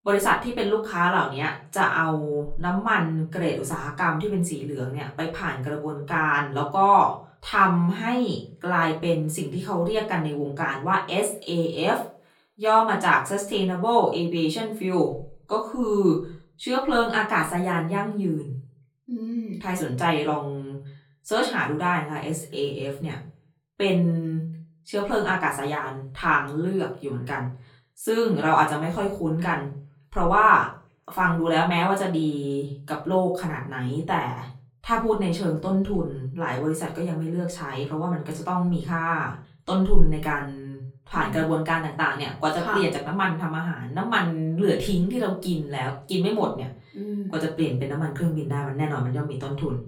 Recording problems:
off-mic speech; far
room echo; very slight; dies away in 0.3 s

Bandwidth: 17.5 kHz